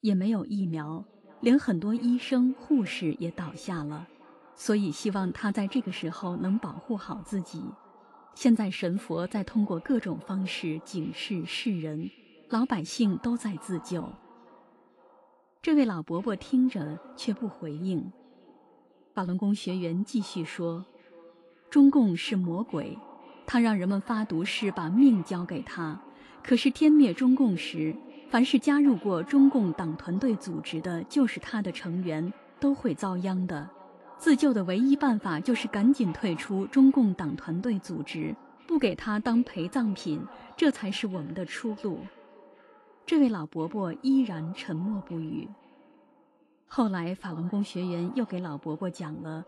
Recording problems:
echo of what is said; faint; throughout; 510 ms later, 25 dB below the speech
garbled, watery; slightly

